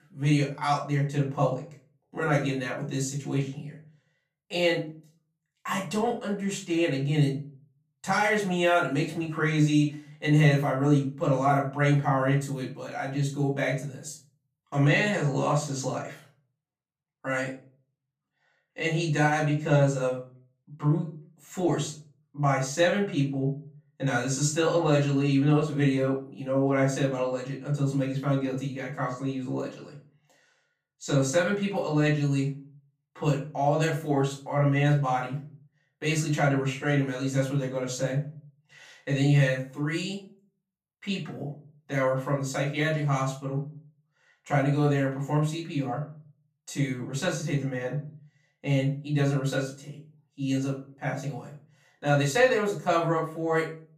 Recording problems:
off-mic speech; far
room echo; slight; dies away in 0.3 s

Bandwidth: 15 kHz